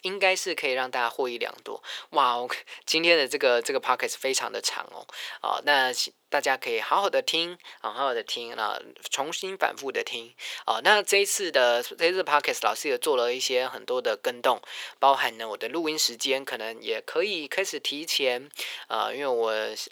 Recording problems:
thin; very; fading below 400 Hz

